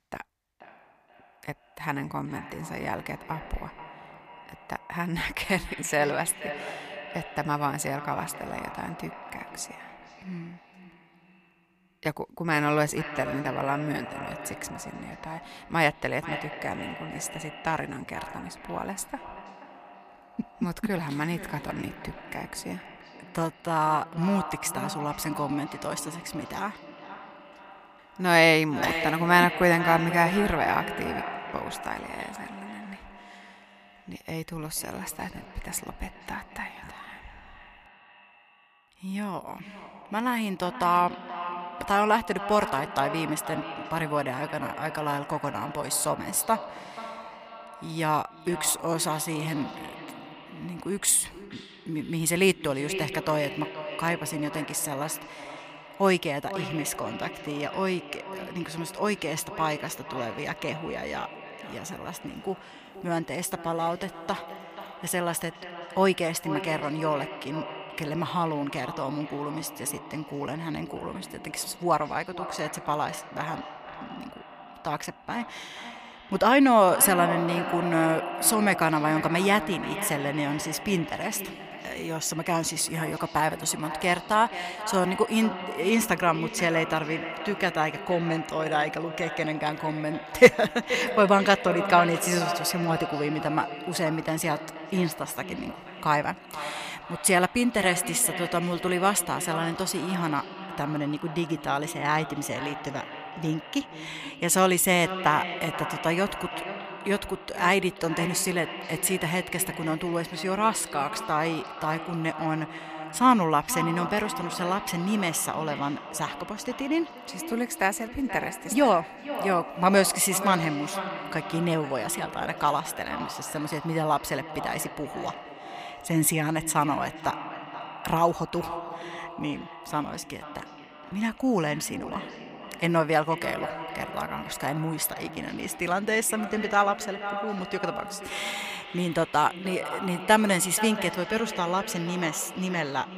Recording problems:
echo of what is said; strong; throughout; 480 ms later, 10 dB below the speech

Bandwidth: 15 kHz